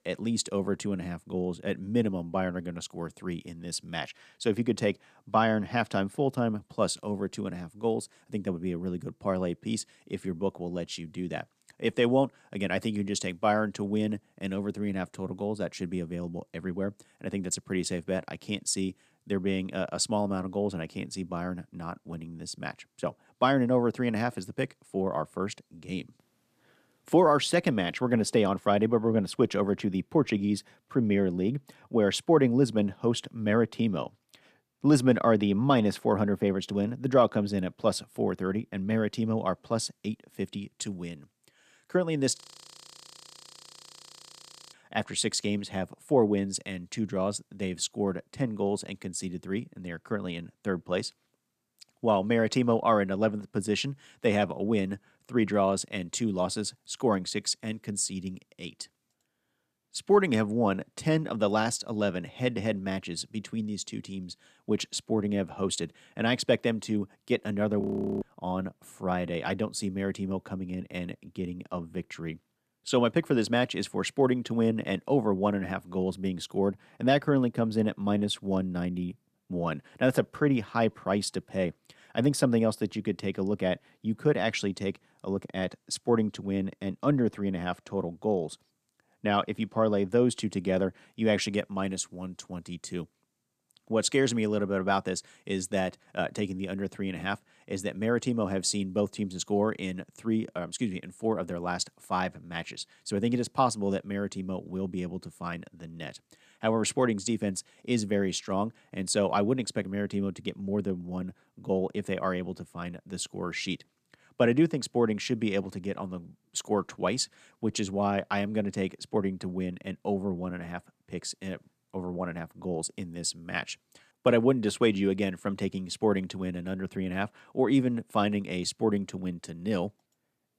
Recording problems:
audio freezing; at 42 s for 2.5 s and at 1:08

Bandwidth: 14.5 kHz